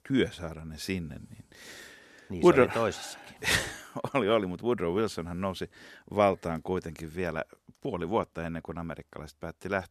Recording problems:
none

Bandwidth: 14 kHz